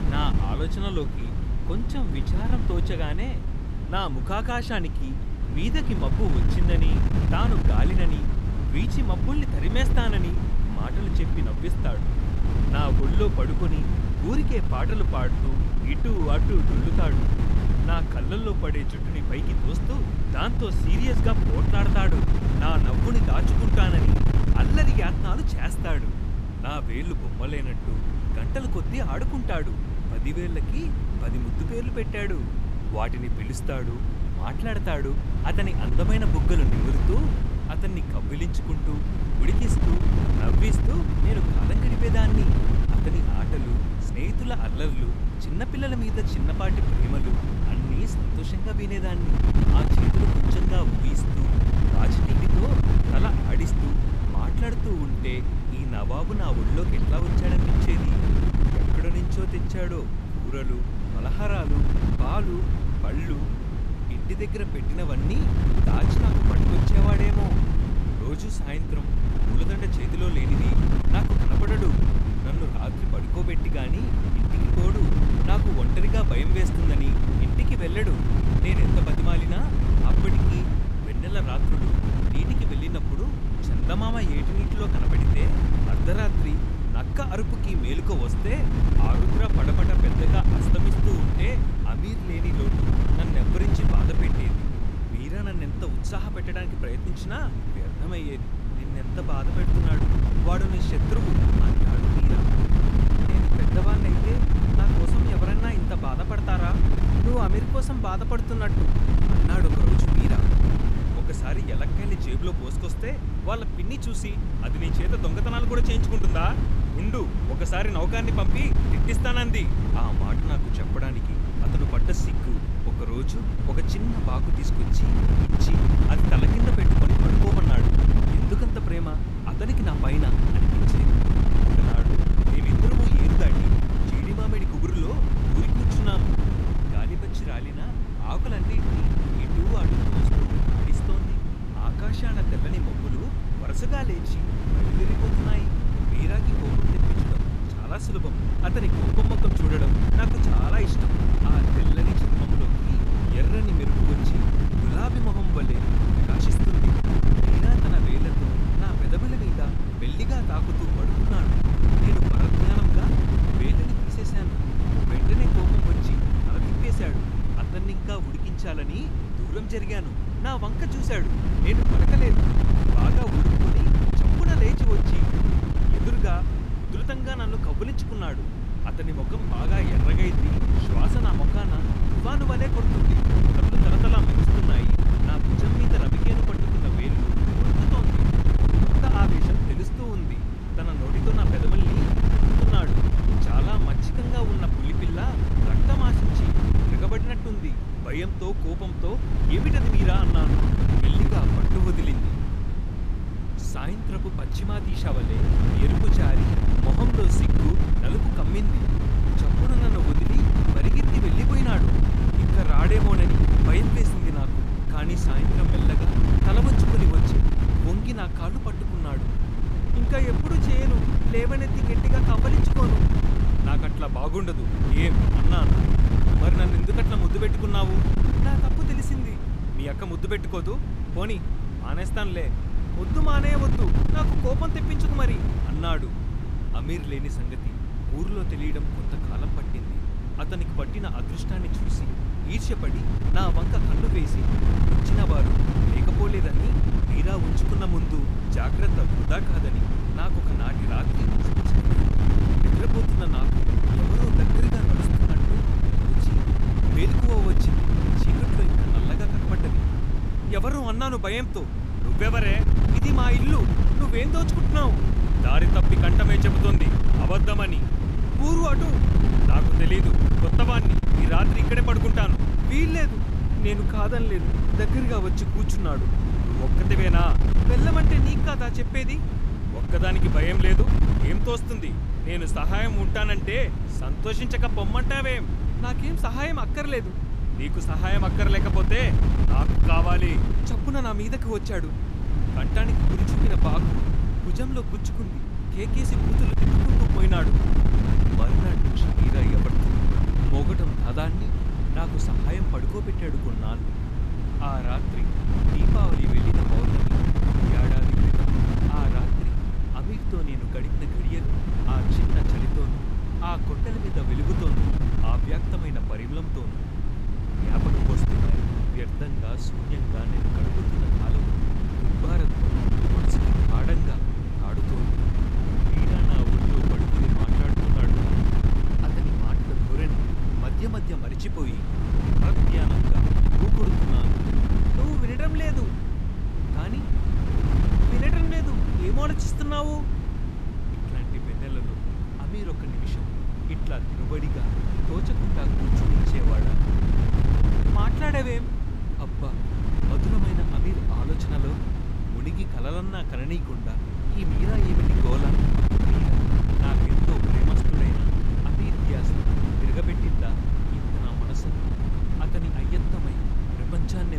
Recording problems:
wind noise on the microphone; heavy; 1 dB below the speech
abrupt cut into speech; at the end

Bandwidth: 15 kHz